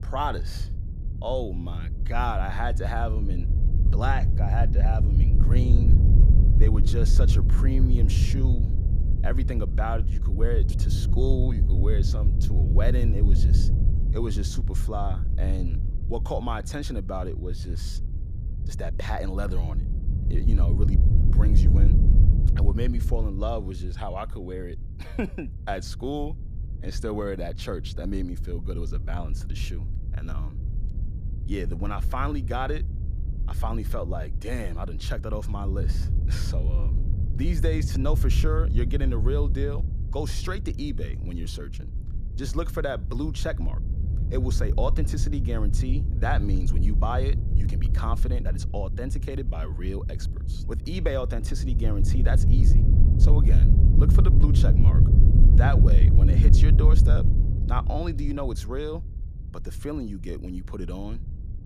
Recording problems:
low rumble; loud; throughout; 6 dB below the speech

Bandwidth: 14.5 kHz